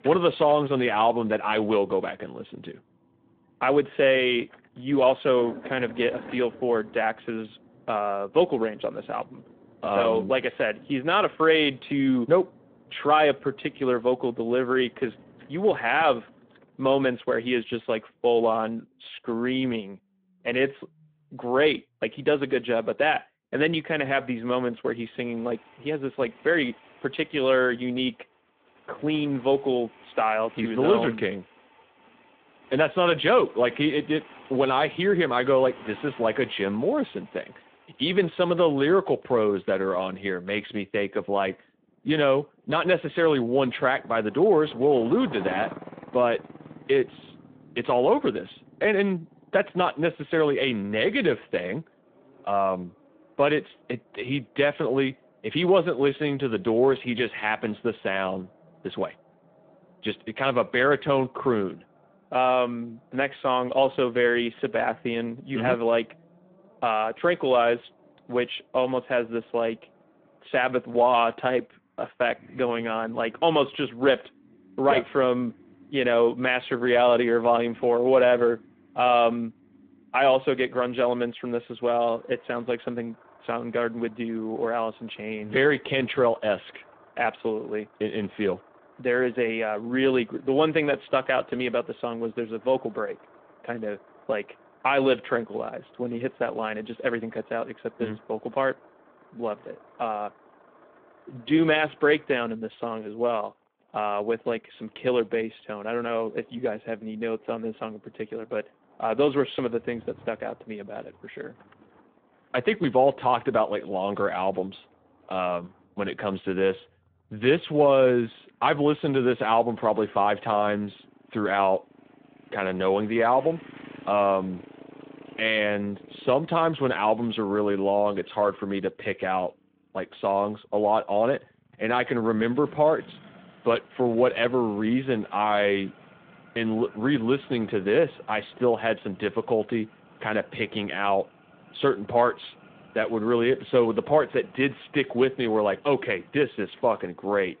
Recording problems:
phone-call audio
traffic noise; faint; throughout; 25 dB below the speech

